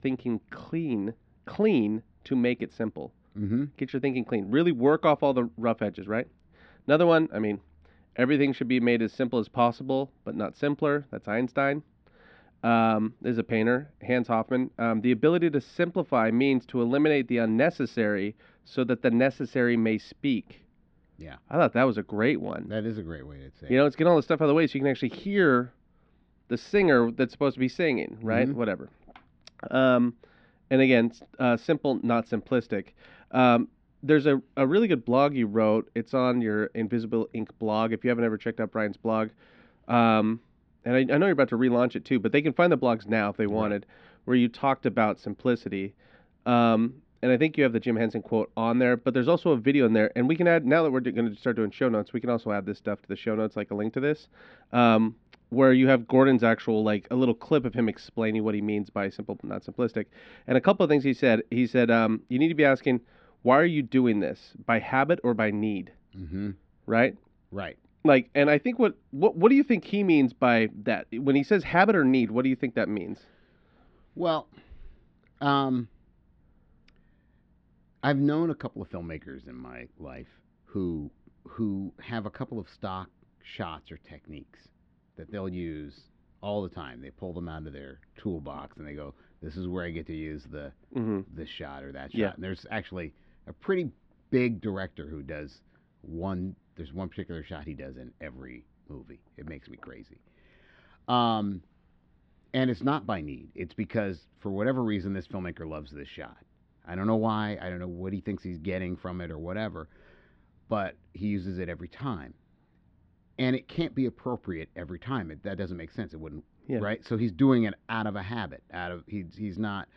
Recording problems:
muffled; slightly; fading above 3.5 kHz

